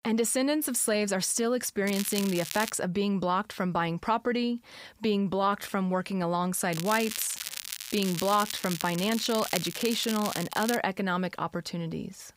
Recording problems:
crackling; loud; at 2 s and from 6.5 to 11 s; 7 dB below the speech

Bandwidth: 15.5 kHz